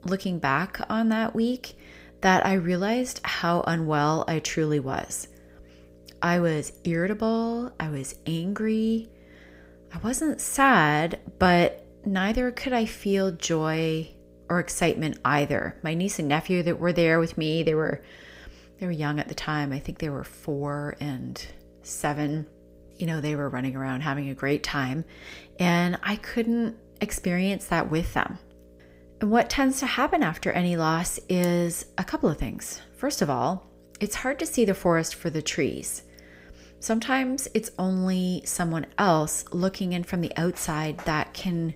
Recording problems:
electrical hum; faint; throughout; 60 Hz, 30 dB below the speech

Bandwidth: 15.5 kHz